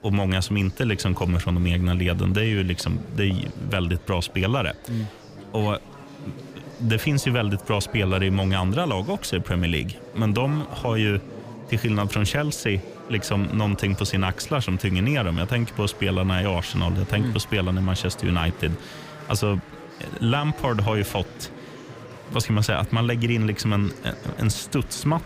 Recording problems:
murmuring crowd; noticeable; throughout; 15 dB below the speech

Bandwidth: 15 kHz